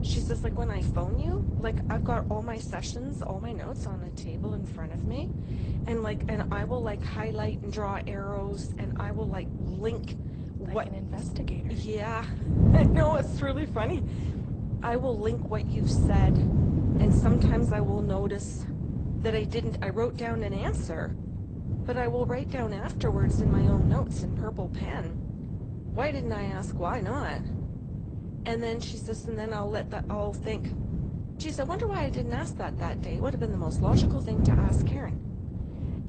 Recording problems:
garbled, watery; slightly; nothing above 8.5 kHz
wind noise on the microphone; heavy; 5 dB below the speech

